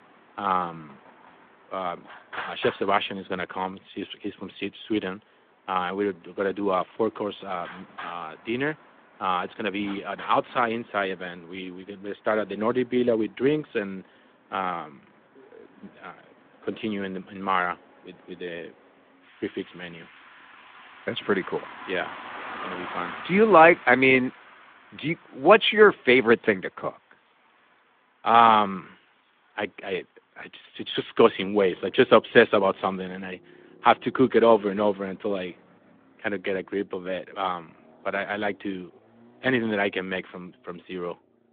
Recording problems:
phone-call audio
traffic noise; noticeable; throughout; 20 dB below the speech

